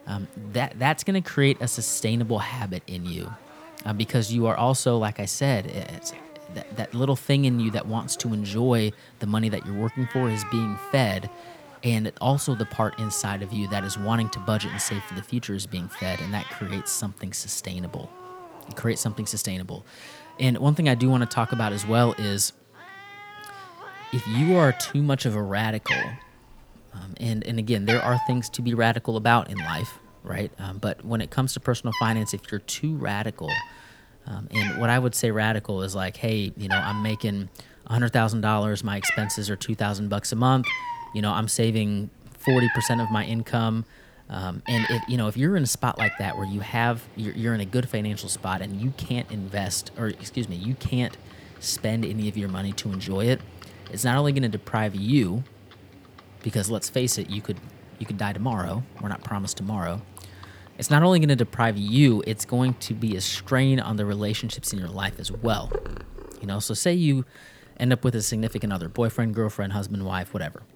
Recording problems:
animal sounds; noticeable; throughout; 10 dB below the speech
murmuring crowd; faint; throughout; 30 dB below the speech

